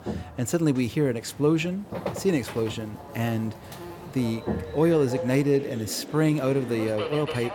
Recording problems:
electrical hum; noticeable; until 5.5 s; 50 Hz, 10 dB below the speech
train or aircraft noise; noticeable; throughout; 10 dB below the speech

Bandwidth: 17.5 kHz